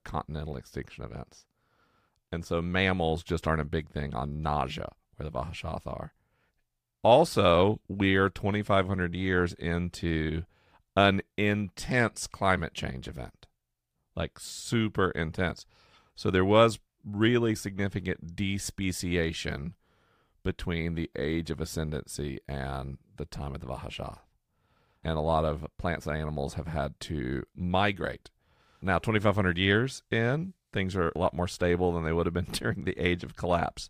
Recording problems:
none

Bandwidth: 15 kHz